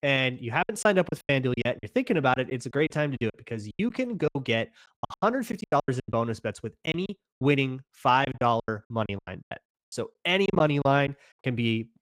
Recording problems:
choppy; very; 17% of the speech affected

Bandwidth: 15.5 kHz